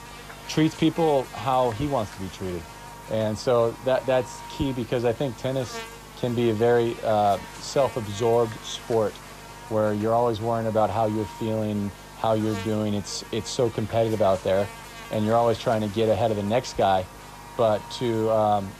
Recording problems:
electrical hum; noticeable; throughout; 50 Hz, 15 dB below the speech

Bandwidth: 14.5 kHz